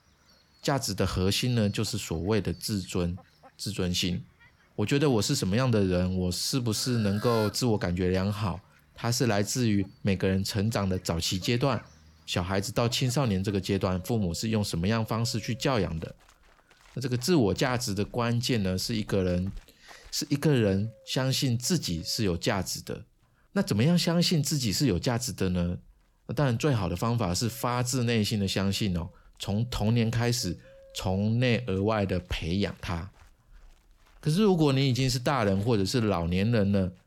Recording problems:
animal sounds; faint; throughout; 25 dB below the speech

